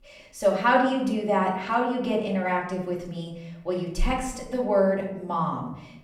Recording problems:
off-mic speech; far
room echo; slight; dies away in 0.7 s

